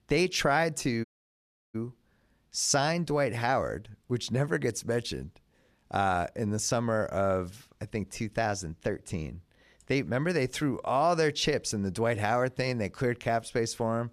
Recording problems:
audio cutting out; at 1 s for 0.5 s

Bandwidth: 14 kHz